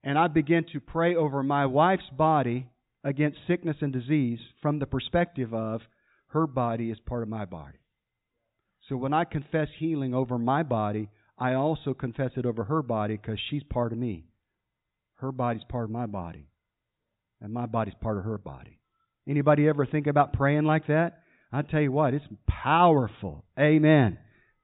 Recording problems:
high frequencies cut off; severe; nothing above 4 kHz

